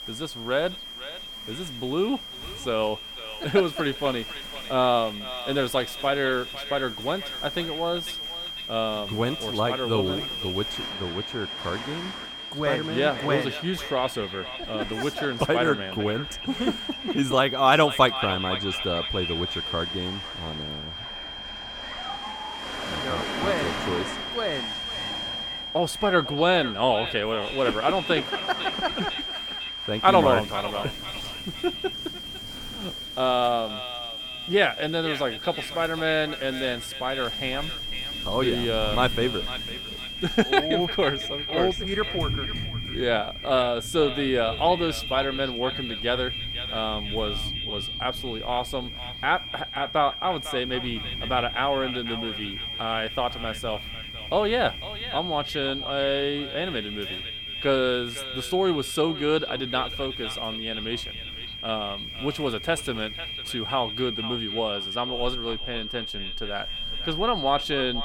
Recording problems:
echo of what is said; noticeable; throughout; 500 ms later, 15 dB below the speech
high-pitched whine; loud; throughout; 3 kHz, 6 dB below the speech
rain or running water; noticeable; throughout; 15 dB below the speech

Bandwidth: 17.5 kHz